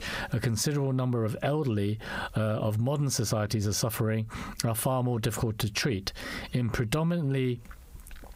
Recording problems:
squashed, flat; heavily

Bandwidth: 15.5 kHz